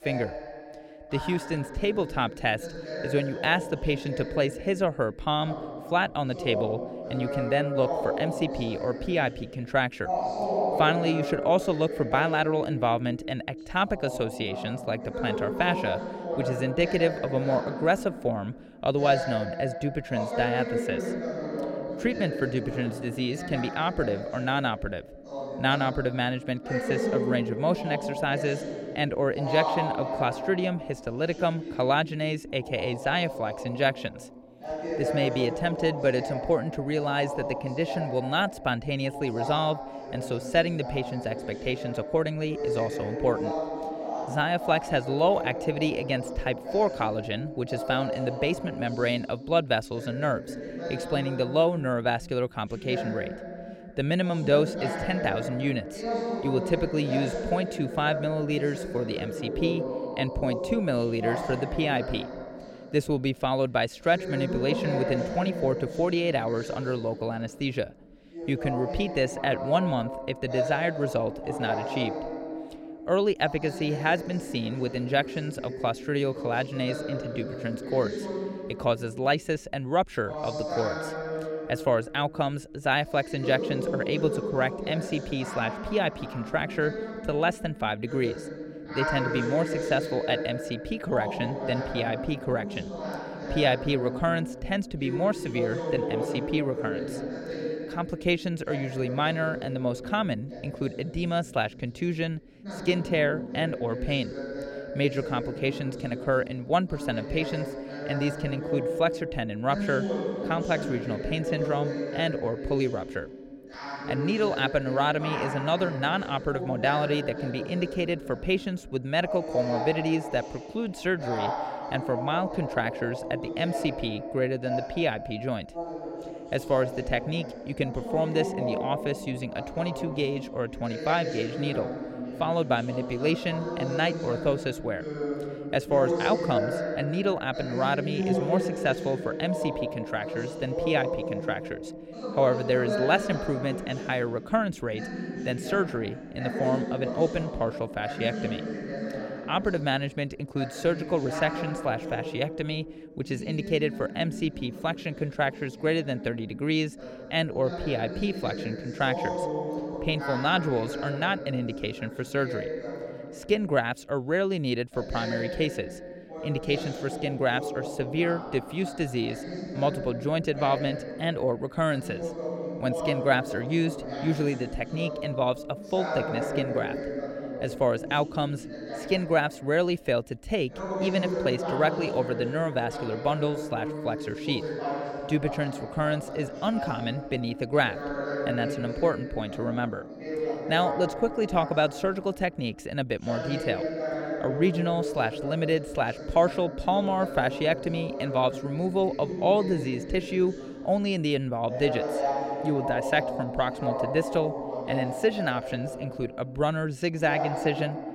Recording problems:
voice in the background; loud; throughout; 5 dB below the speech

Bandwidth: 16.5 kHz